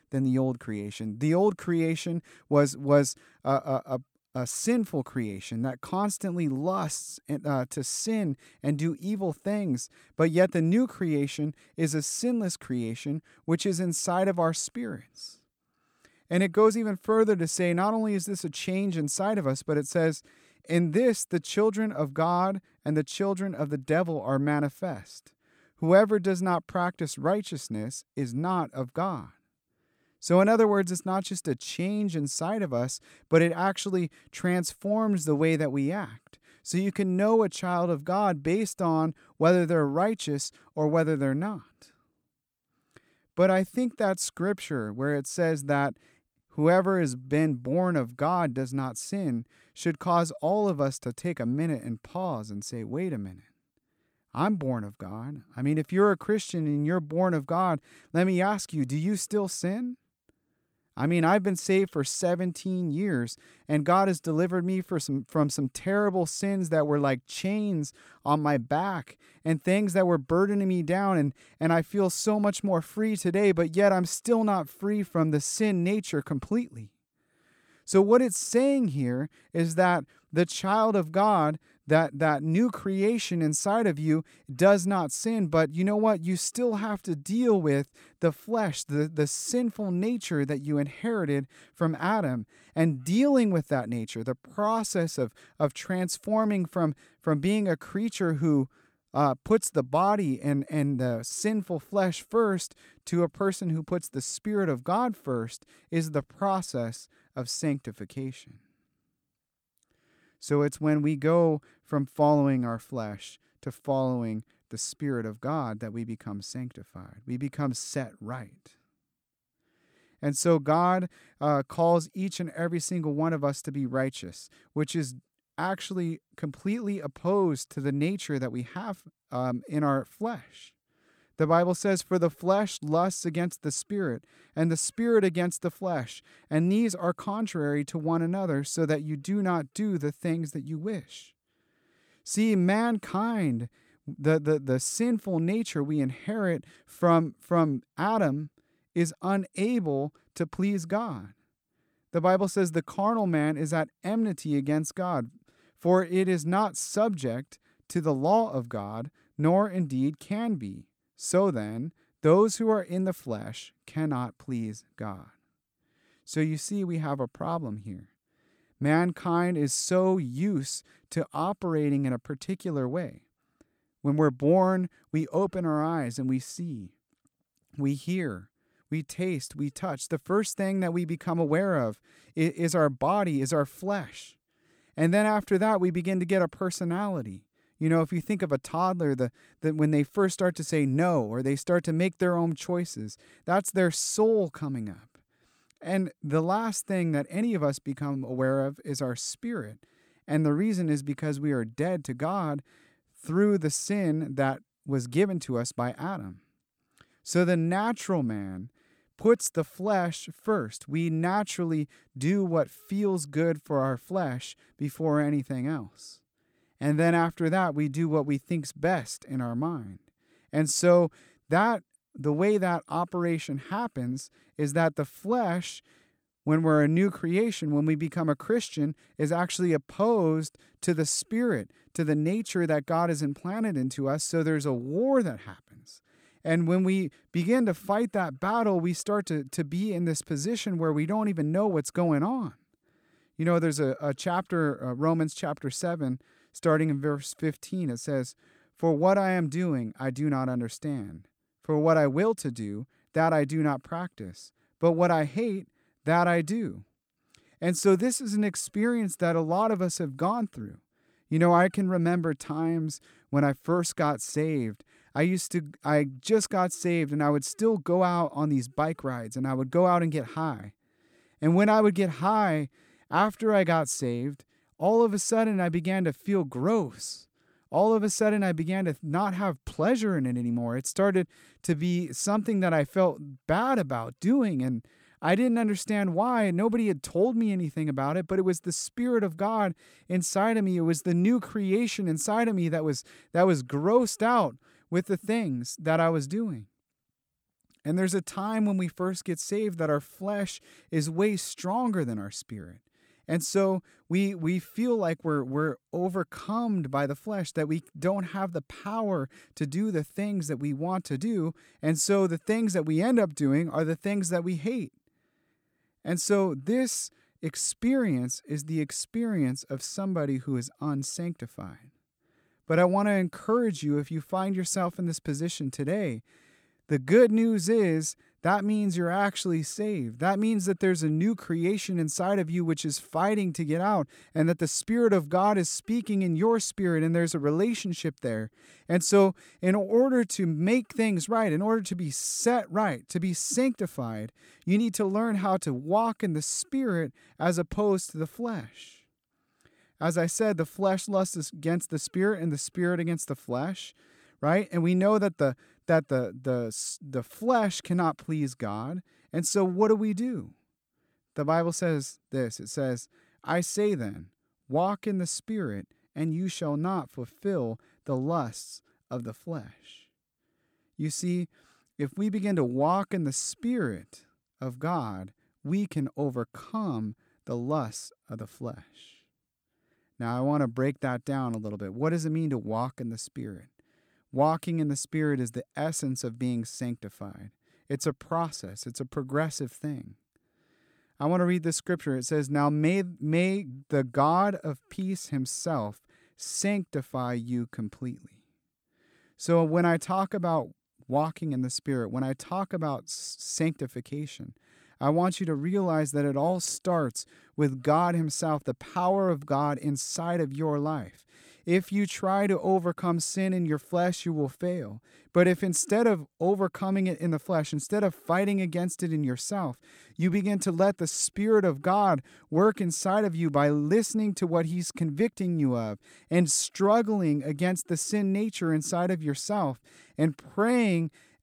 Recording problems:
none

